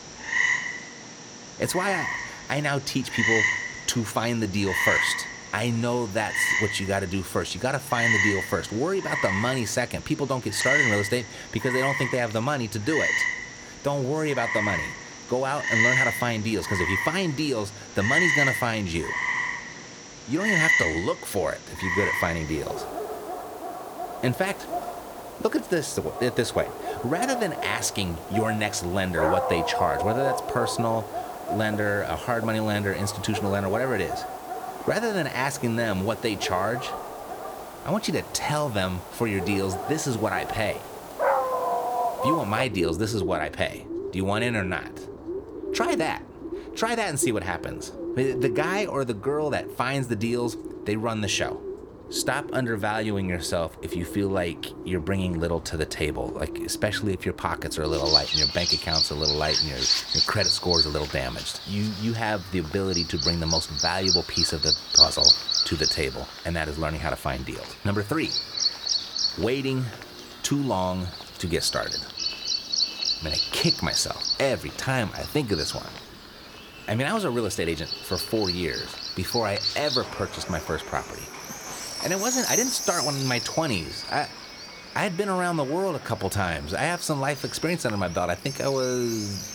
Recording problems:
animal sounds; very loud; throughout; 1 dB above the speech

